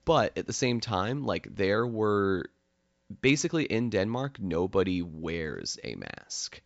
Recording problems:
high frequencies cut off; noticeable; nothing above 8 kHz

